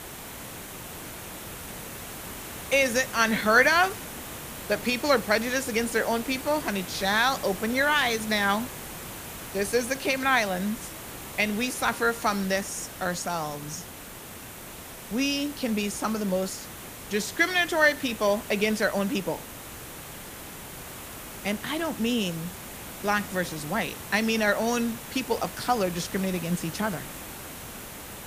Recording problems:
hiss; noticeable; throughout; 10 dB below the speech

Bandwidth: 15 kHz